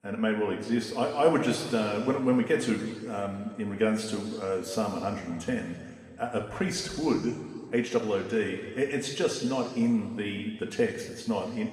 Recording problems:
off-mic speech; far
room echo; noticeable; dies away in 1.9 s

